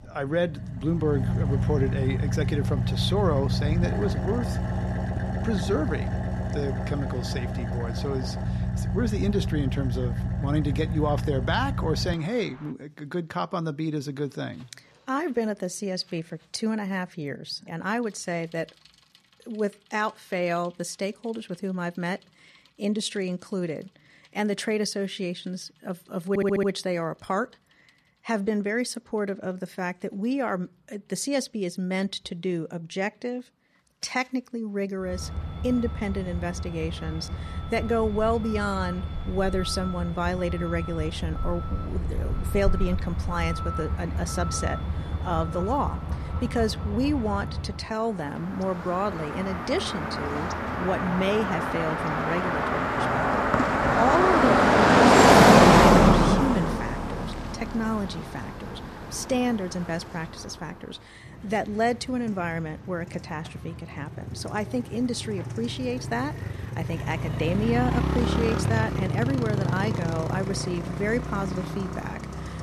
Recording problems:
traffic noise; very loud; throughout; 4 dB above the speech
audio stuttering; at 26 s

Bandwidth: 13.5 kHz